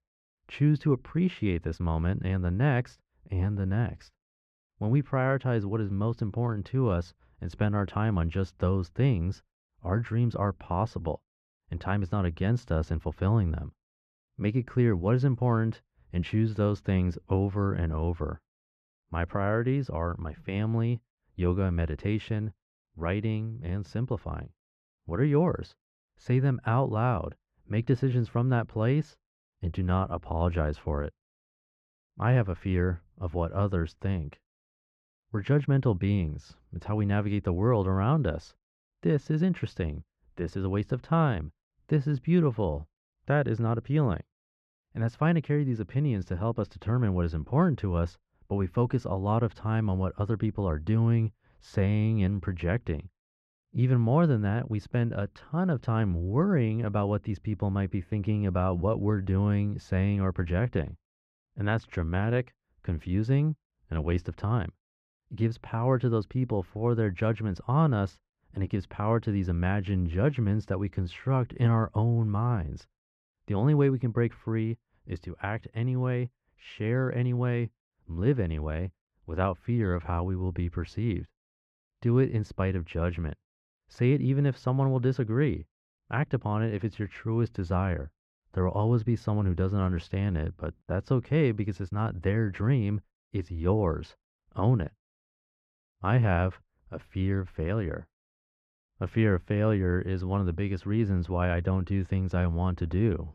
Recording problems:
muffled; slightly; fading above 2.5 kHz

